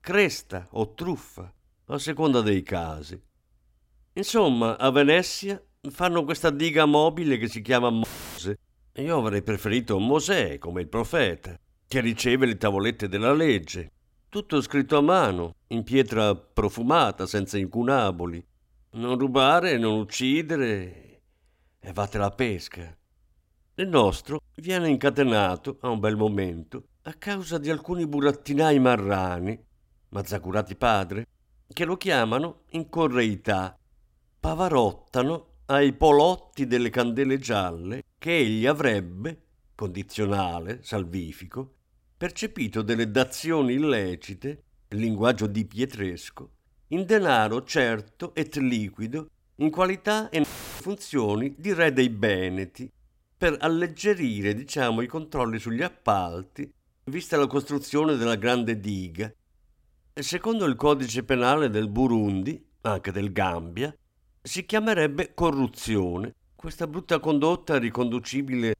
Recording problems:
audio cutting out; filled with static; at 8 s and at 50 s

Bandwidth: 16 kHz